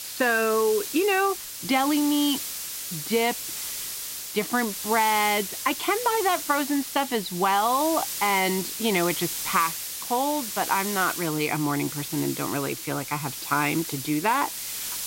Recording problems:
high frequencies cut off; noticeable; nothing above 5.5 kHz
hiss; loud; throughout; 6 dB below the speech

